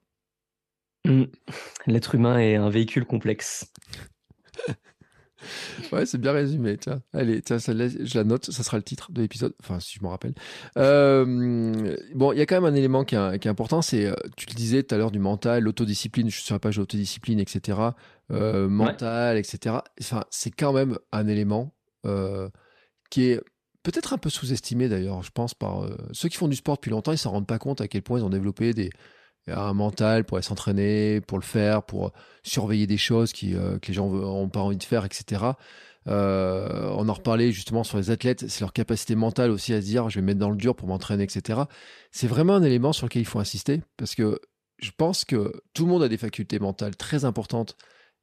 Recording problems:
none

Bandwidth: 14 kHz